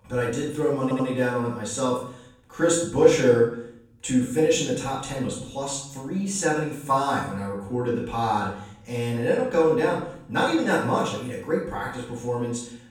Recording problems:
off-mic speech; far
room echo; noticeable; dies away in 0.6 s
audio stuttering; at 1 s

